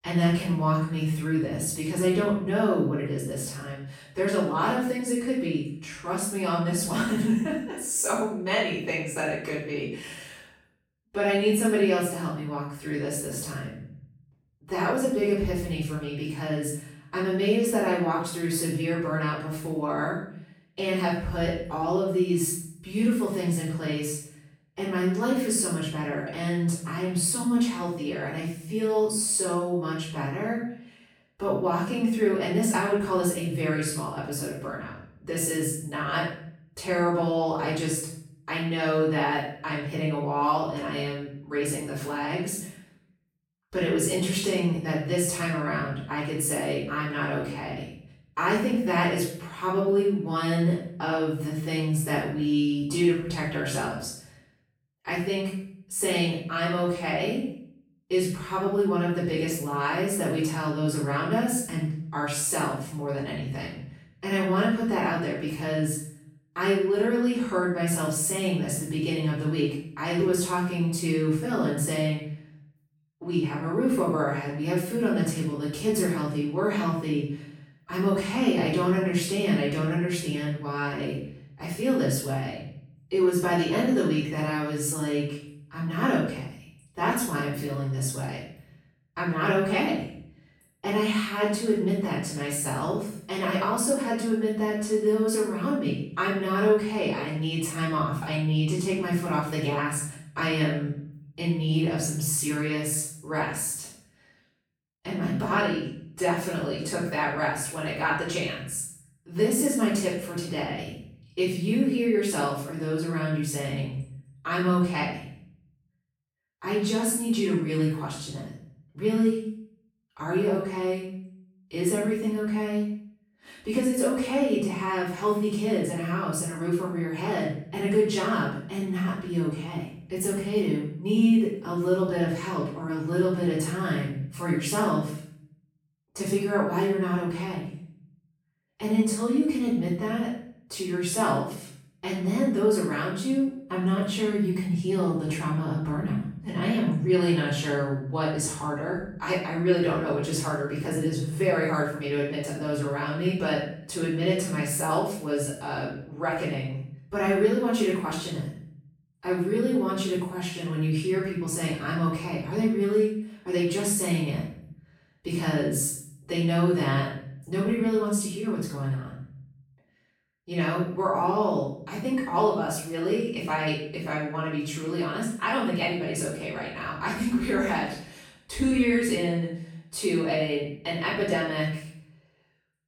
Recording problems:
off-mic speech; far
room echo; noticeable; dies away in 0.6 s

